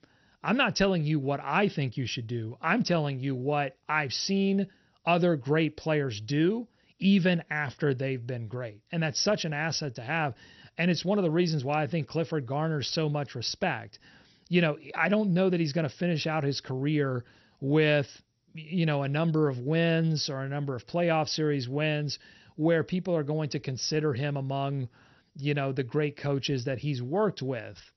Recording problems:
garbled, watery; slightly; nothing above 6 kHz

